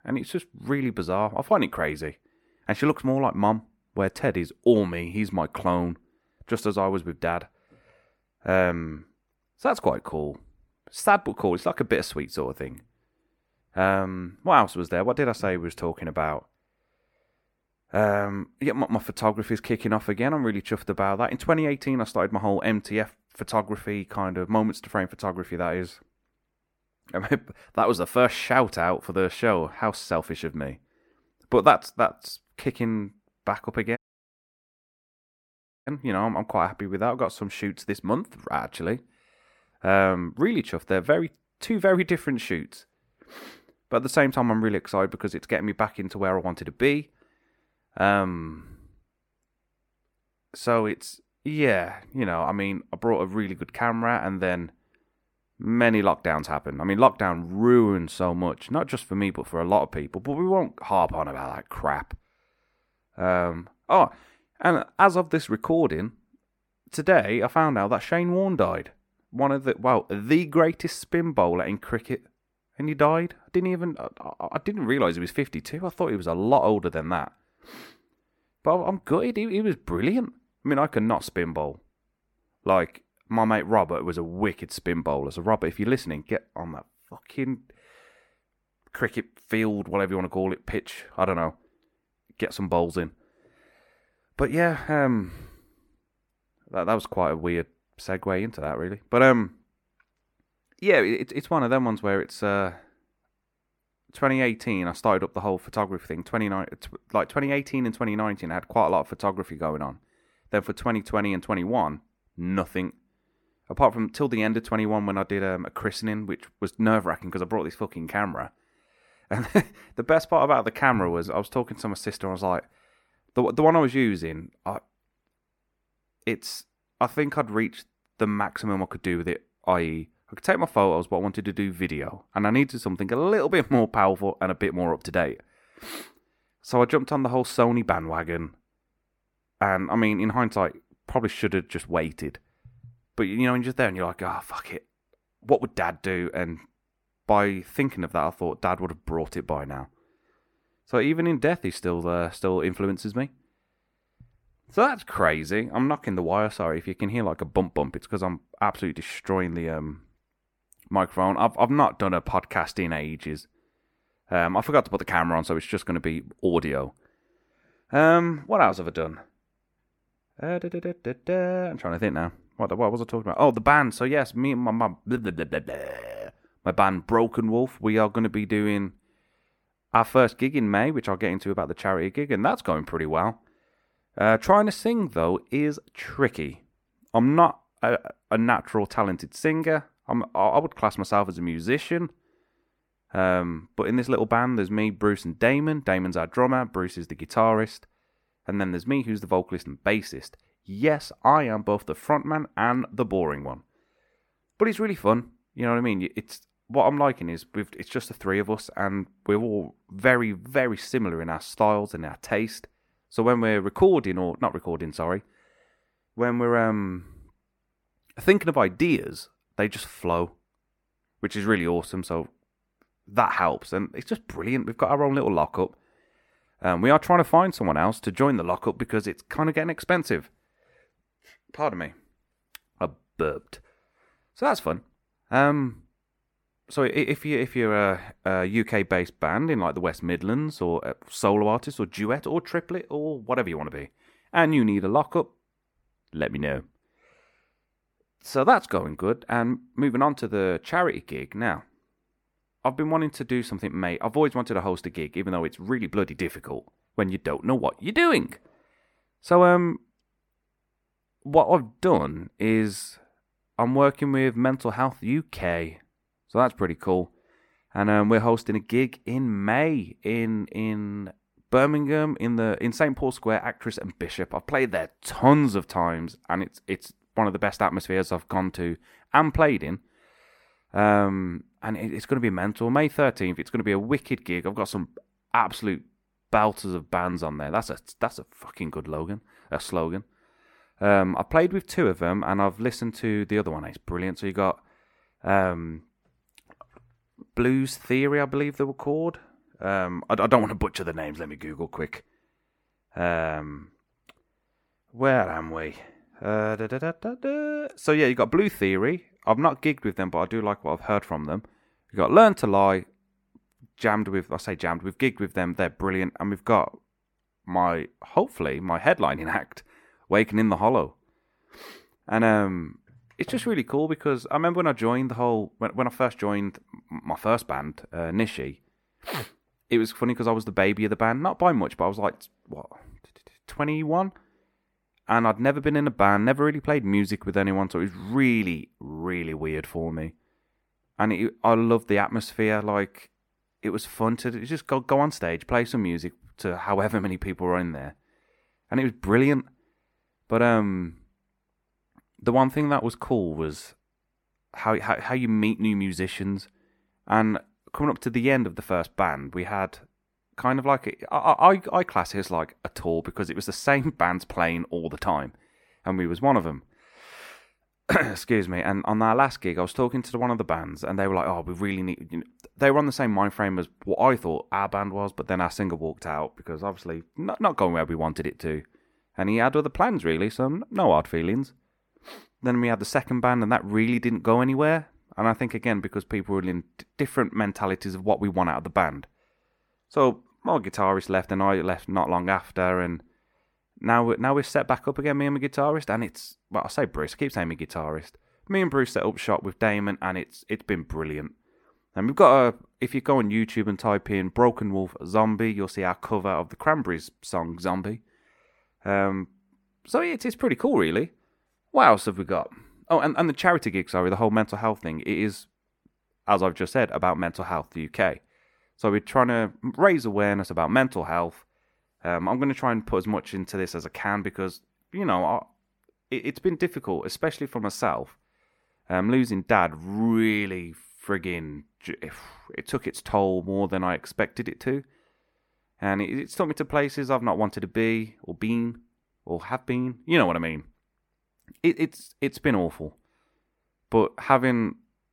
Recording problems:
audio cutting out; at 34 s for 2 s

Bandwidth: 17 kHz